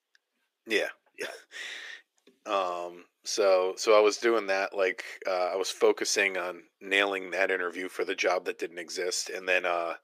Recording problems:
thin; very; fading below 350 Hz

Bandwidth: 15 kHz